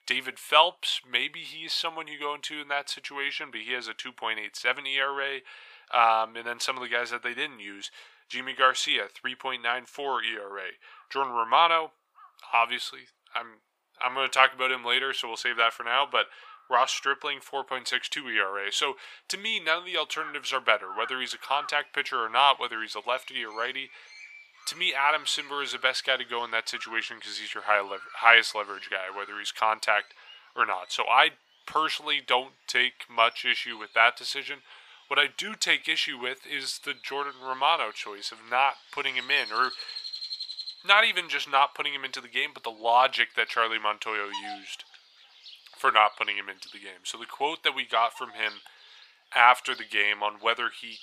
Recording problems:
thin; very; fading below 800 Hz
animal sounds; noticeable; throughout; 20 dB below the speech

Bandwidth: 15 kHz